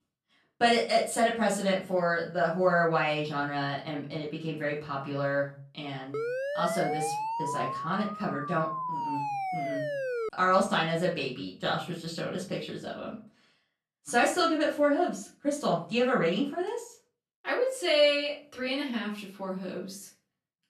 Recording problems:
off-mic speech; far
room echo; slight; dies away in 0.3 s
siren; noticeable; from 6 to 10 s; peak 3 dB below the speech

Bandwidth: 13.5 kHz